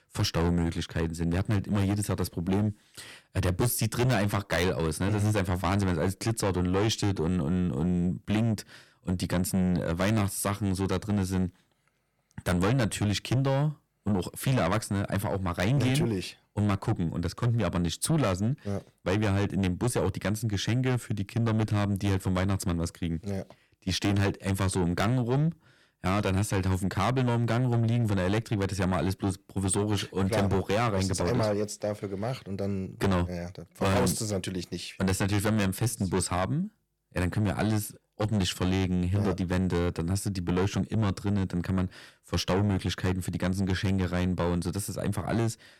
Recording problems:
distortion; heavy; 7 dB below the speech

